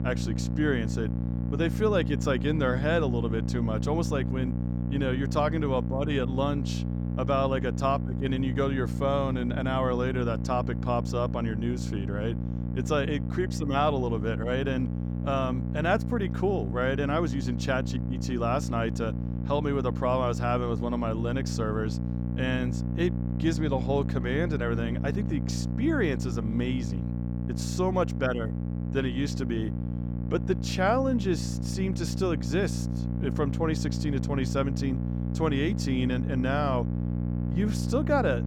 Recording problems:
electrical hum; loud; throughout; 60 Hz, 10 dB below the speech

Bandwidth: 17.5 kHz